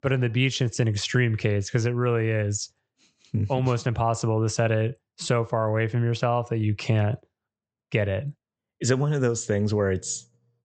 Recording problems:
high frequencies cut off; noticeable; nothing above 8 kHz

